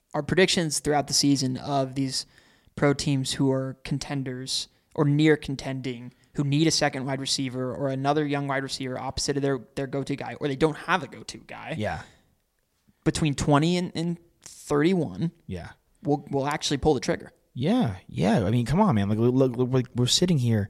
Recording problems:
none

